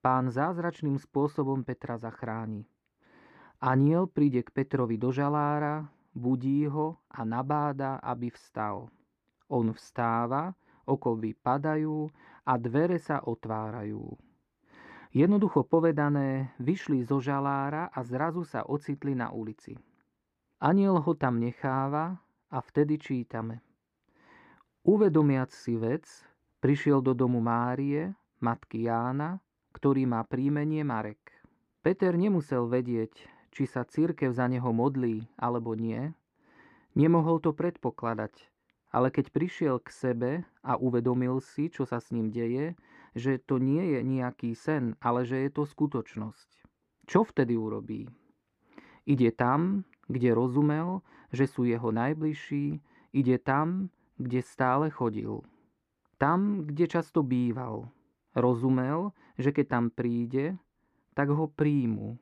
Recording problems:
muffled; slightly; fading above 3.5 kHz

